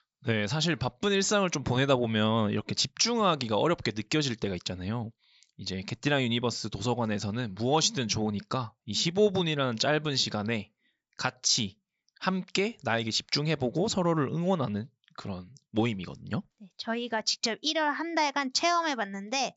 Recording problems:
high frequencies cut off; noticeable; nothing above 7.5 kHz

